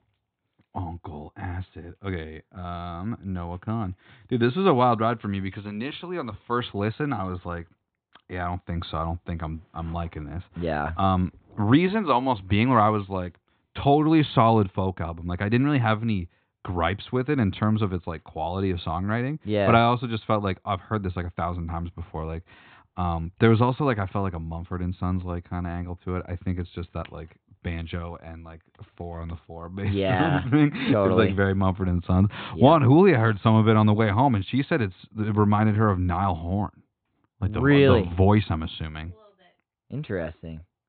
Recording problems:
high frequencies cut off; severe; nothing above 4 kHz

